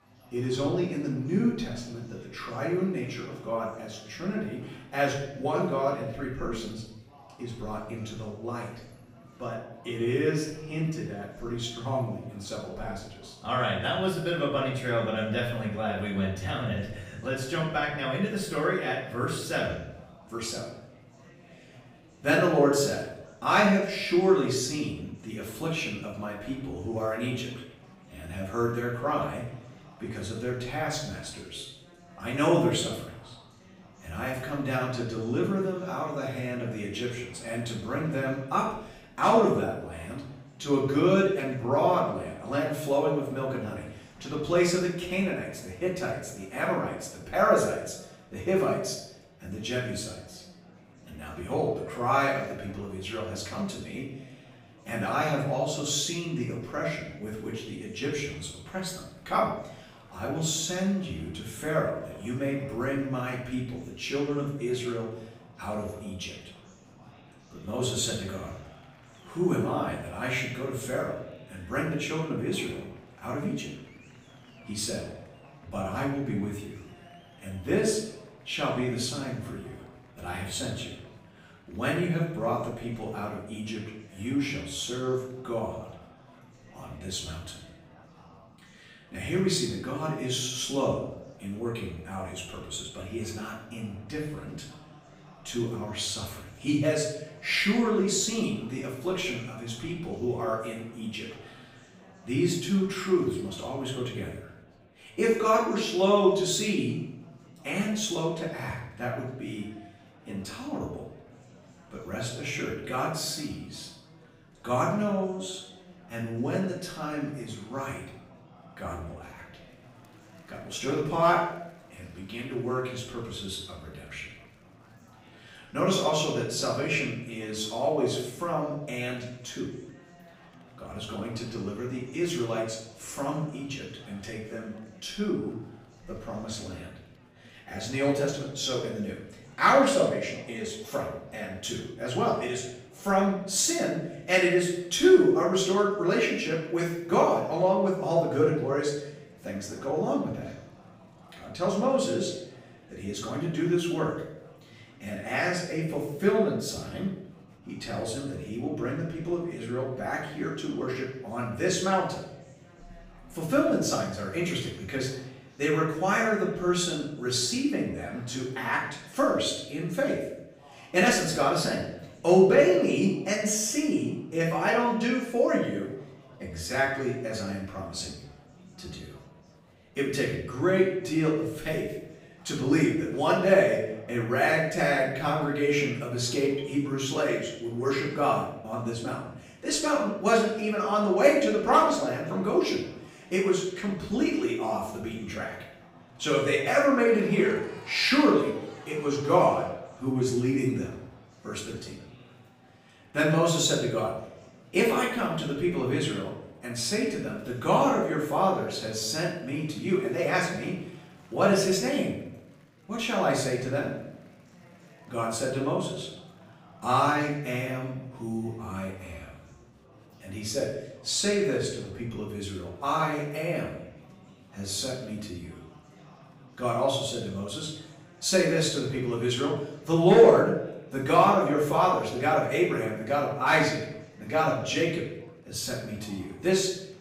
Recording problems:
off-mic speech; far
room echo; noticeable; dies away in 0.7 s
murmuring crowd; faint; throughout; 25 dB below the speech

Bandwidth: 15.5 kHz